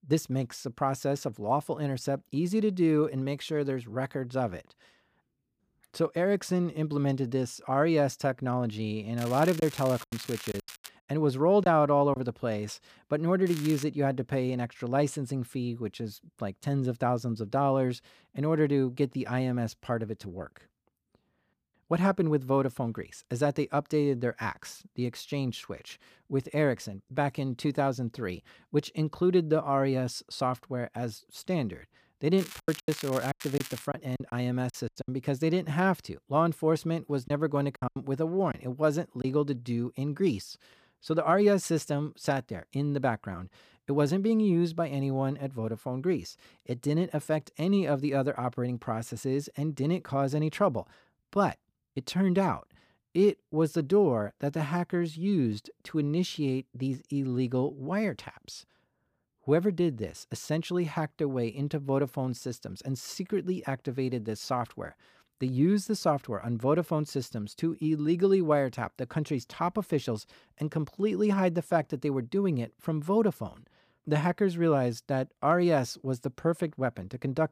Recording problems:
crackling; noticeable; from 9 to 11 s, at 13 s and from 32 to 34 s; 15 dB below the speech
choppy; very; from 9.5 to 12 s, from 33 to 35 s and from 37 to 39 s; 14% of the speech affected

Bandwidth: 15 kHz